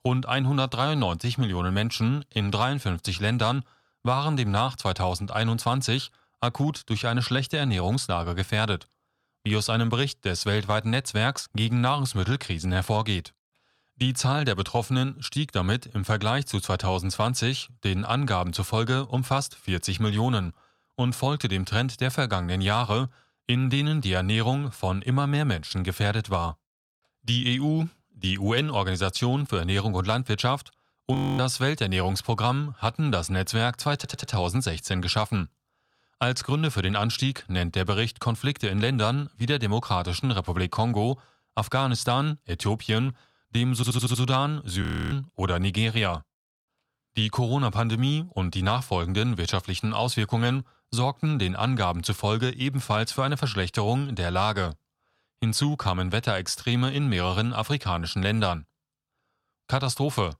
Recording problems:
audio freezing; at 31 s and at 45 s
audio stuttering; at 34 s and at 44 s

